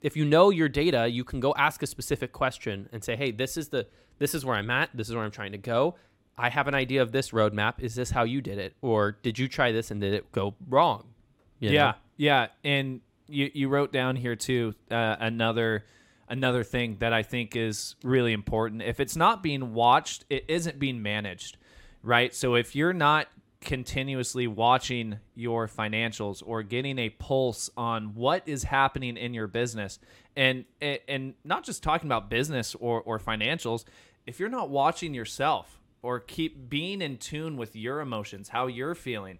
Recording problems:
none

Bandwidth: 16 kHz